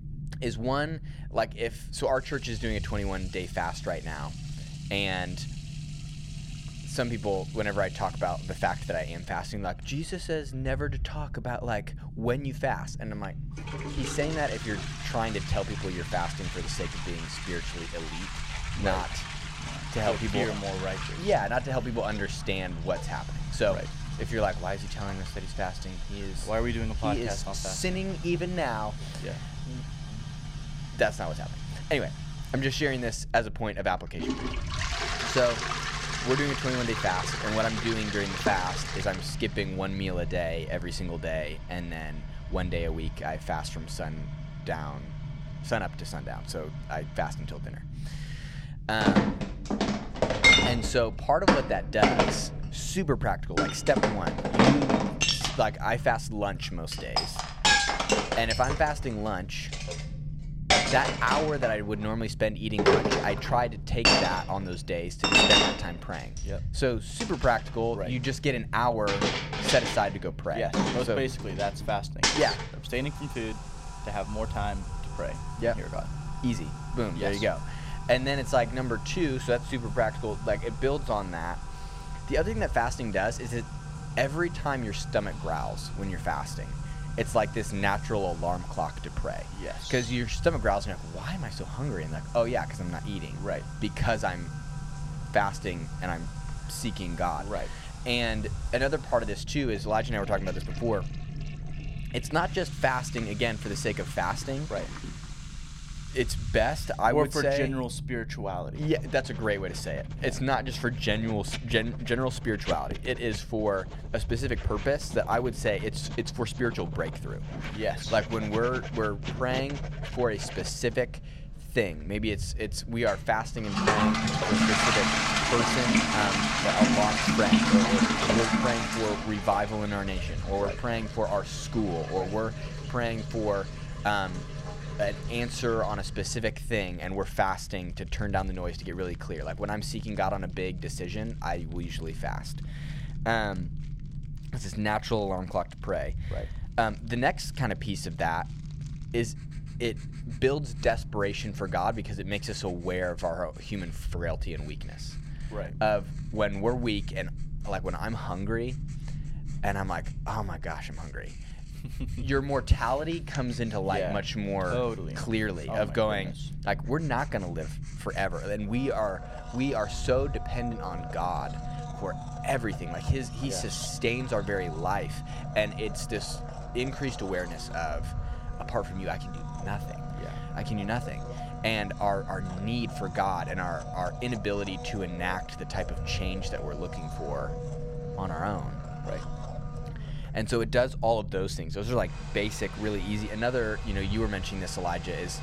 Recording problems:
household noises; very loud; throughout; 1 dB above the speech
low rumble; faint; throughout; 20 dB below the speech

